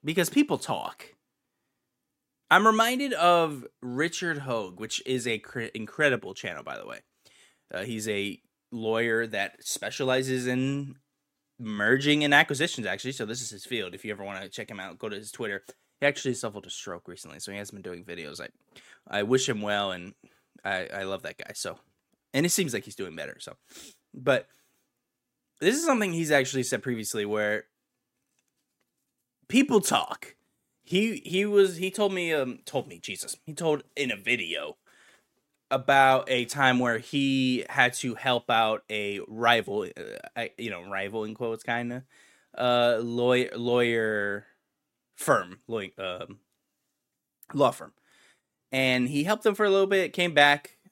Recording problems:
none

